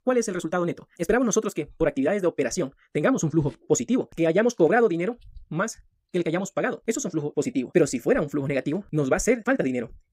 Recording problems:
wrong speed, natural pitch; too fast; 1.7 times normal speed

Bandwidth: 15.5 kHz